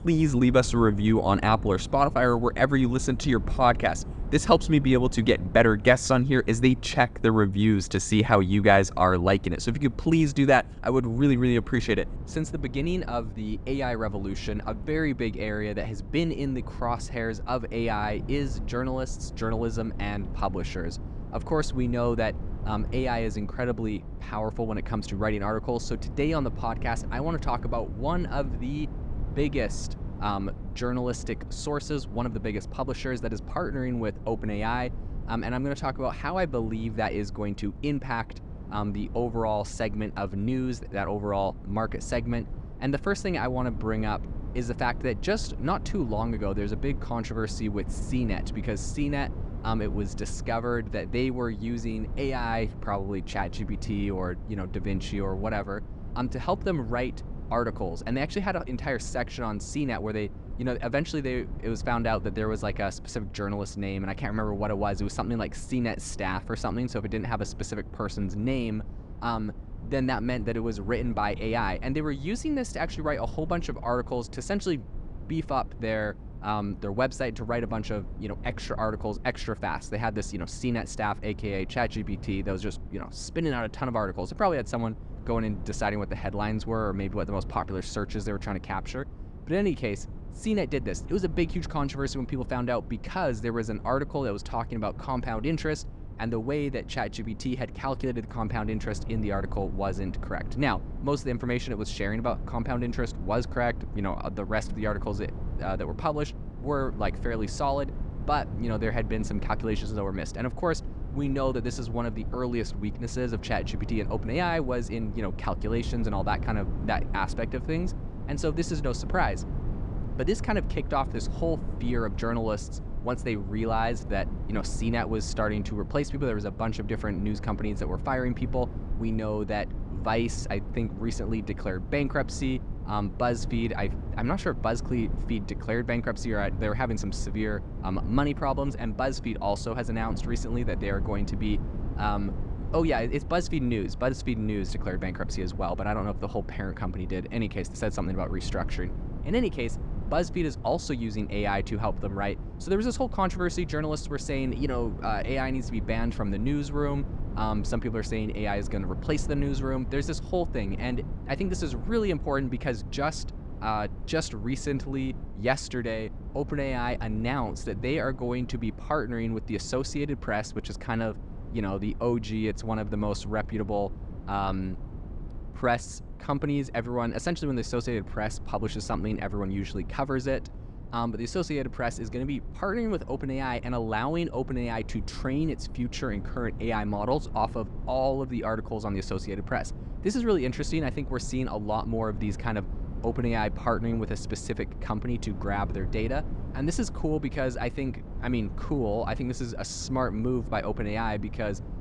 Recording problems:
low rumble; noticeable; throughout; 20 dB below the speech

